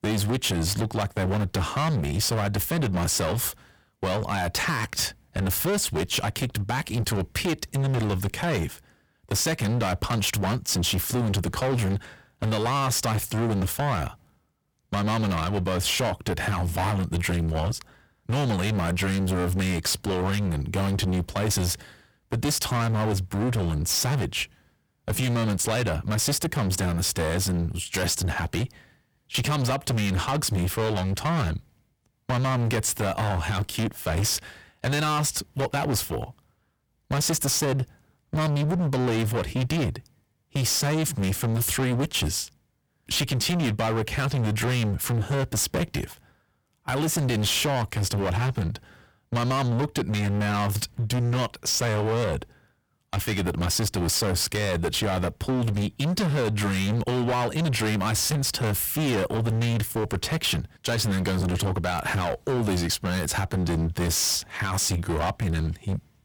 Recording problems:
distortion; heavy; 27% of the sound clipped

